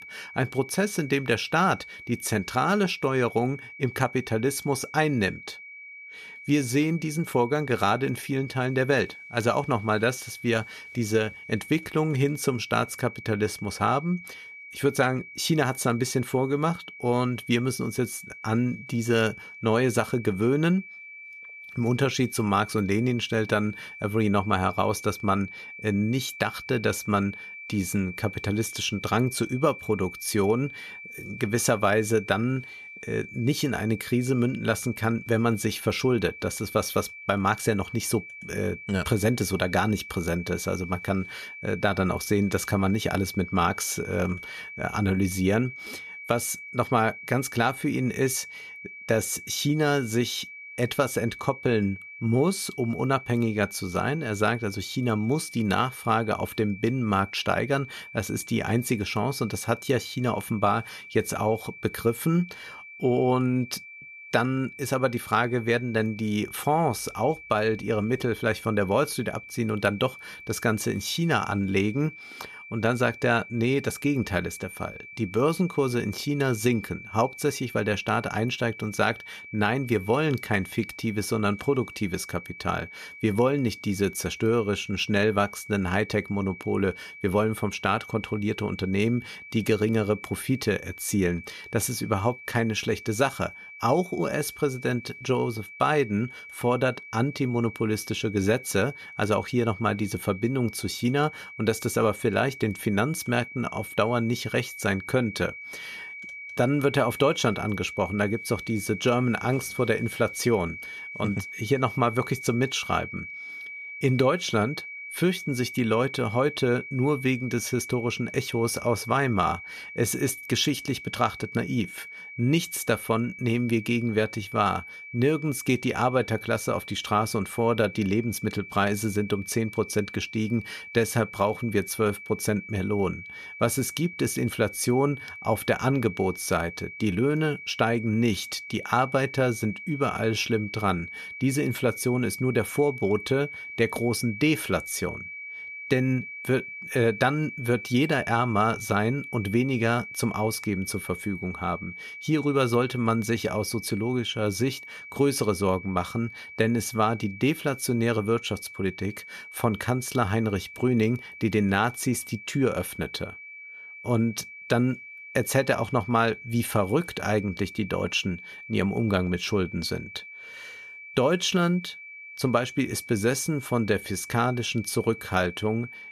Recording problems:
high-pitched whine; noticeable; throughout; 2.5 kHz, 15 dB below the speech

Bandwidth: 14.5 kHz